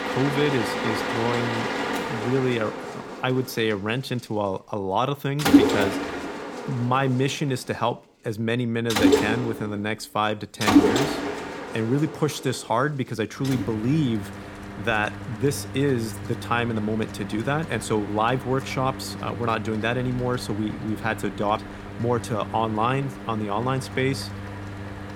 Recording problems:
machinery noise; loud; throughout; 2 dB below the speech

